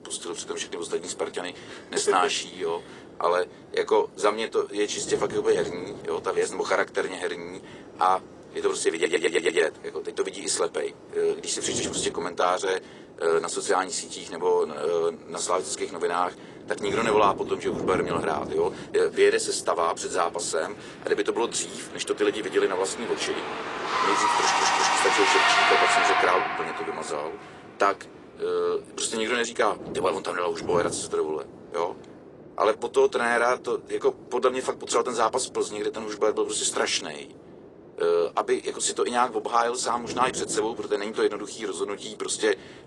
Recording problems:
thin; very; fading below 400 Hz
garbled, watery; slightly
traffic noise; very loud; throughout; 3 dB above the speech
wind noise on the microphone; occasional gusts; 20 dB below the speech
audio stuttering; at 9 s and at 24 s

